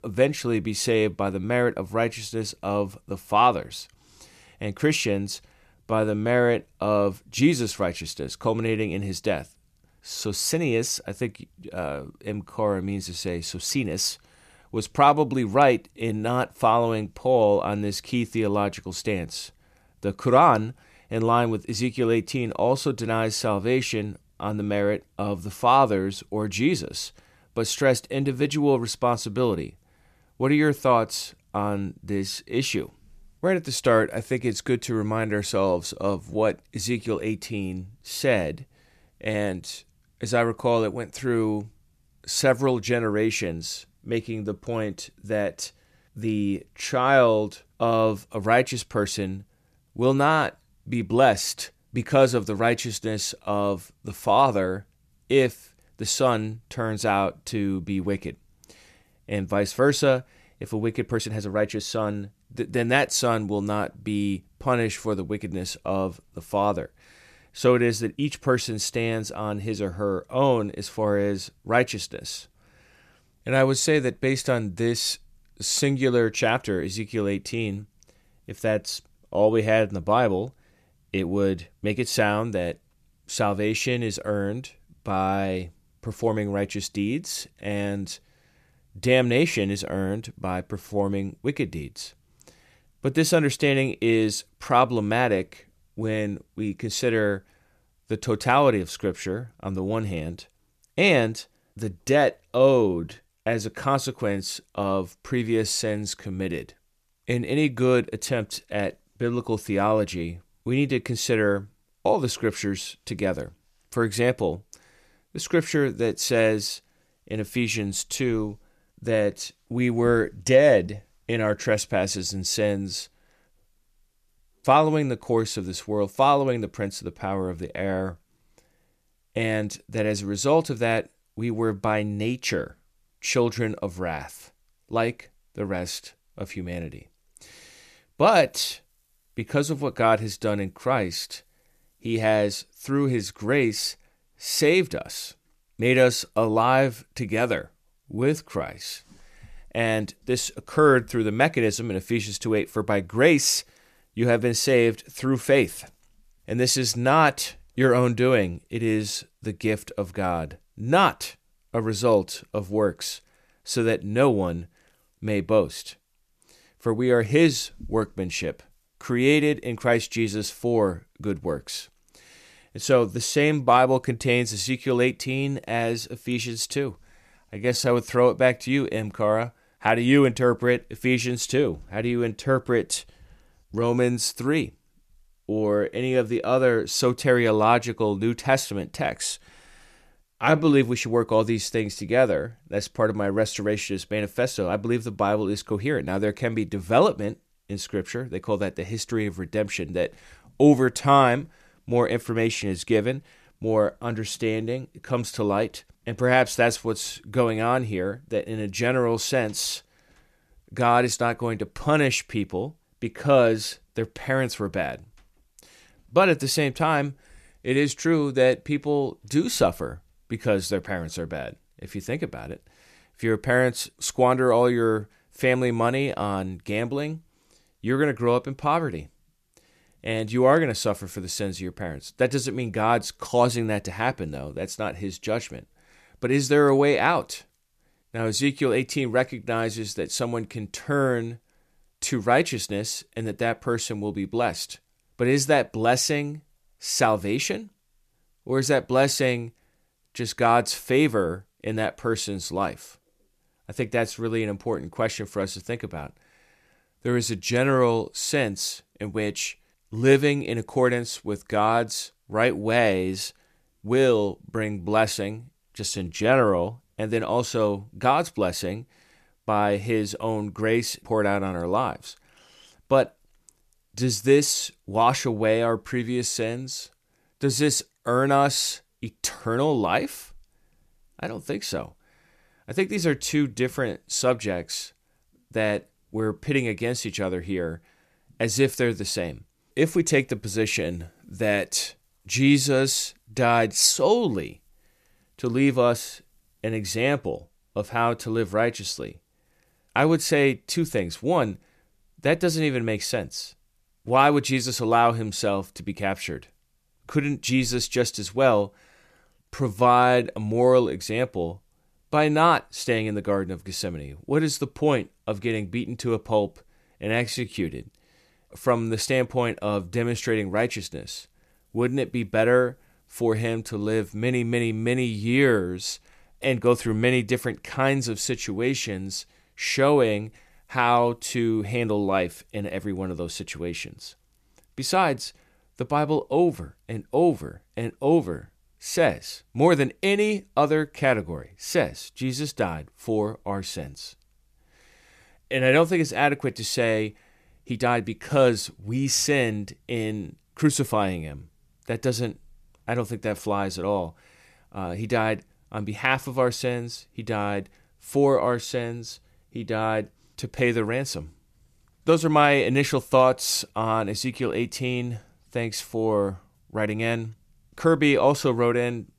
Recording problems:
uneven, jittery; strongly; from 5.5 s to 6:07

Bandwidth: 14.5 kHz